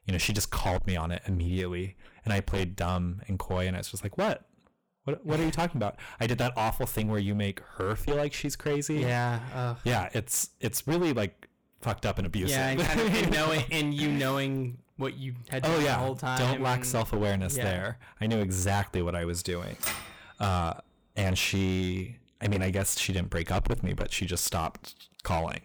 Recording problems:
distortion; heavy; 15% of the sound clipped
keyboard typing; noticeable; at 20 s; peak 2 dB below the speech

